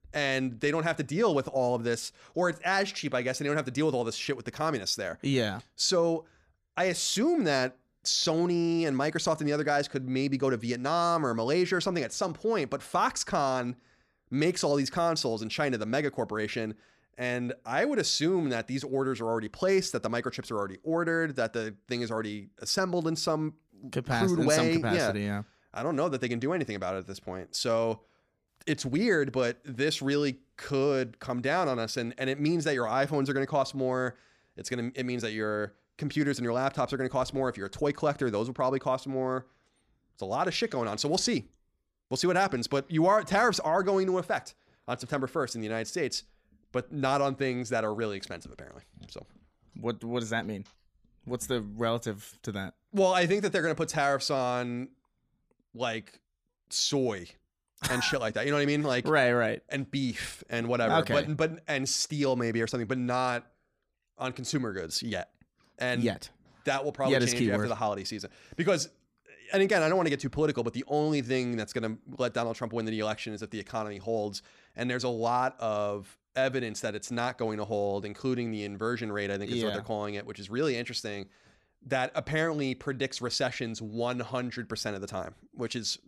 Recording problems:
none

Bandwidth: 15 kHz